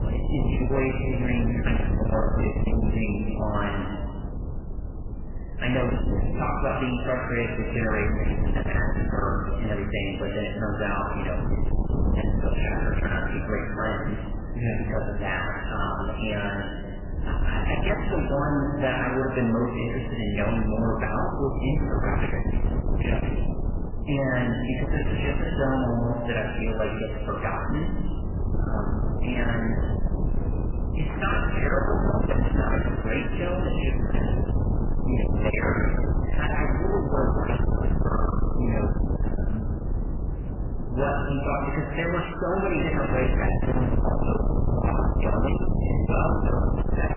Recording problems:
distortion; heavy; 7 dB below the speech
garbled, watery; badly; nothing above 3 kHz
room echo; noticeable; dies away in 1.6 s
off-mic speech; somewhat distant
wind noise on the microphone; heavy; 7 dB below the speech

